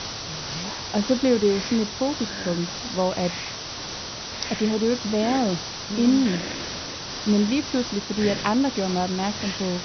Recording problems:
high frequencies cut off; noticeable; nothing above 6 kHz
hiss; loud; throughout; 6 dB below the speech

